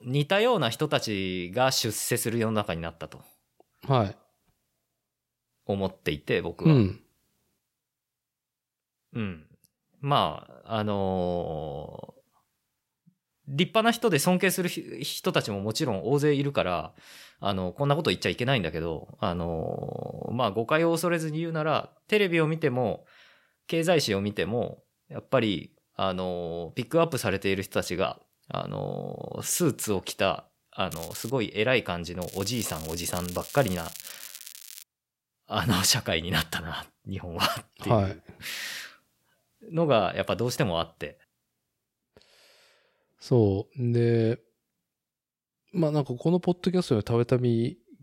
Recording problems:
crackling; noticeable; at 31 s and from 32 to 35 s; 15 dB below the speech

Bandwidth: 16 kHz